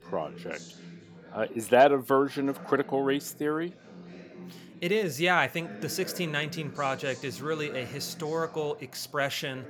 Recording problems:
background chatter; noticeable; throughout; 4 voices, 20 dB below the speech

